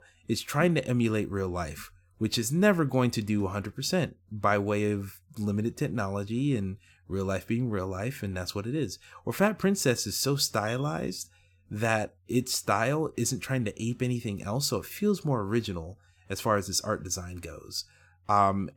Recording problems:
none

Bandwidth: 17.5 kHz